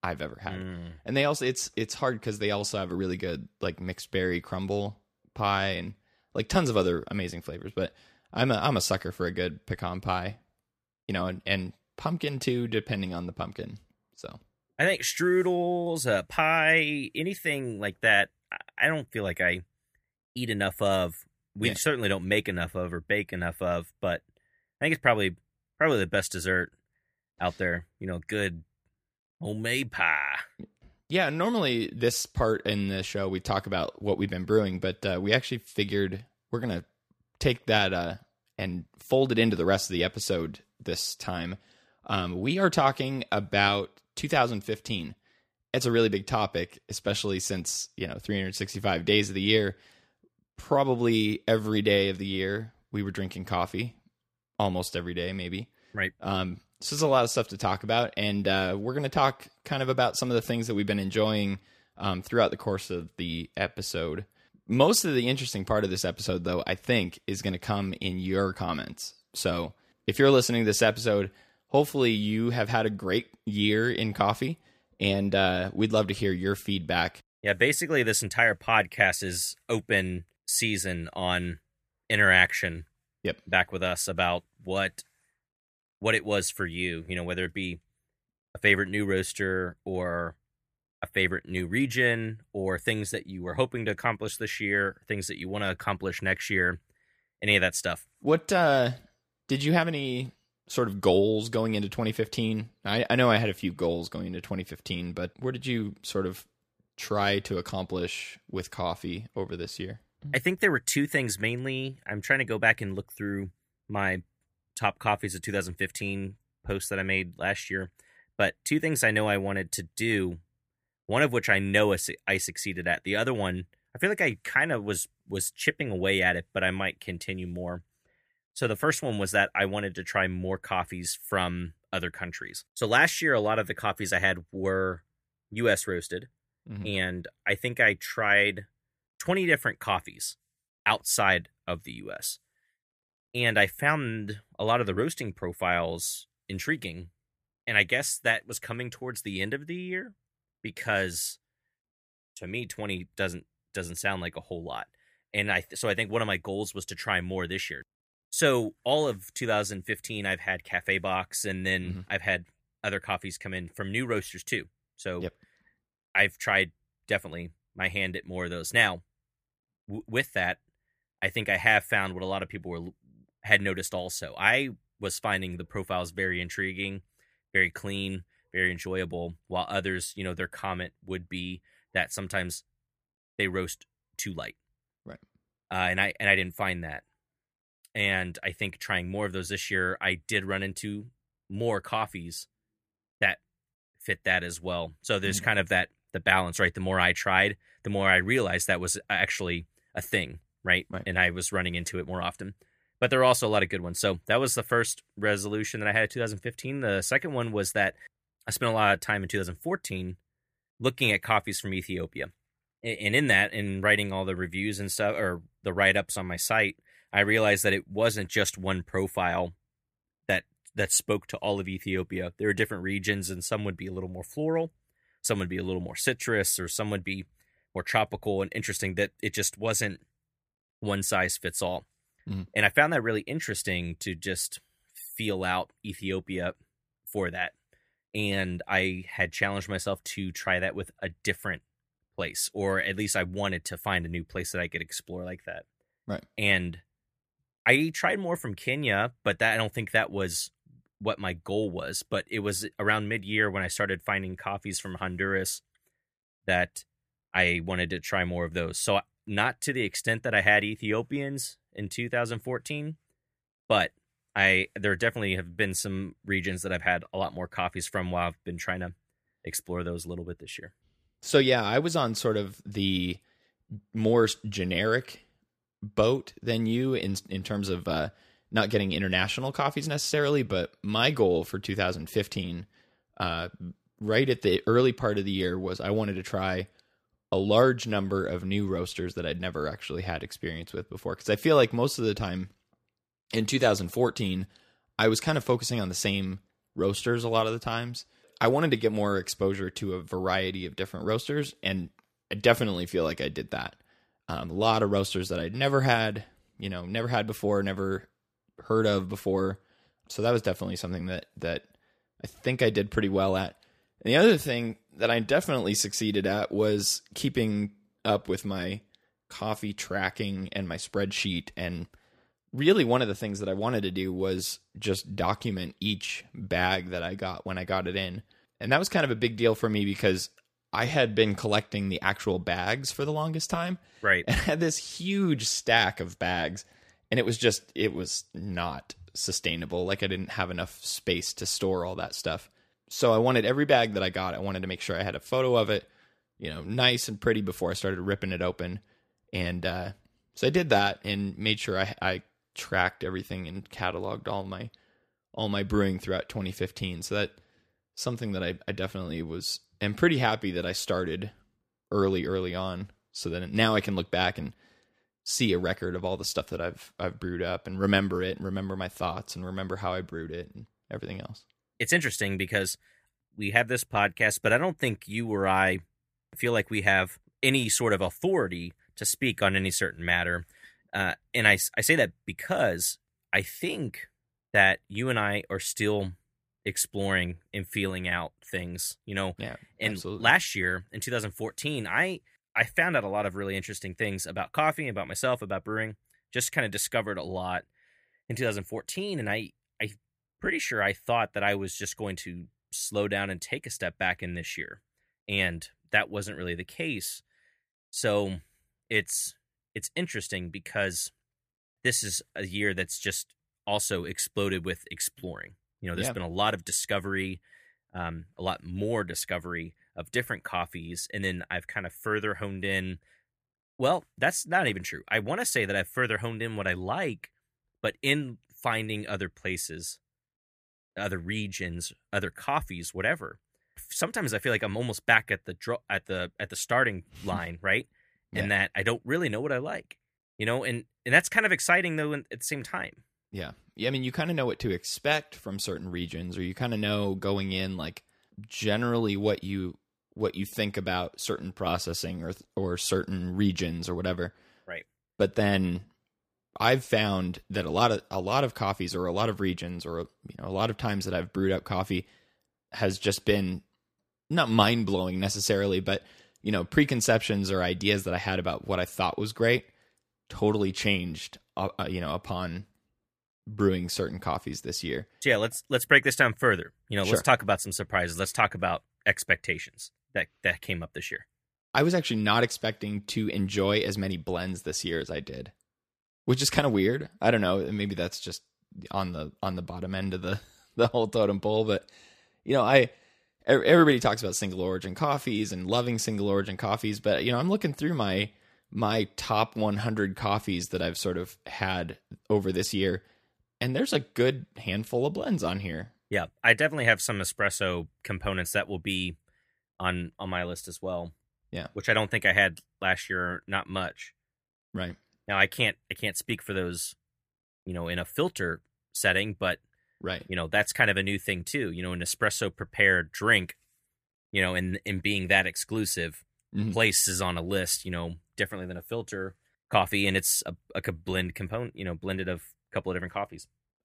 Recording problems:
none

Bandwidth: 15 kHz